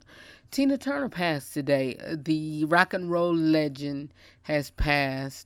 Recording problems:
none

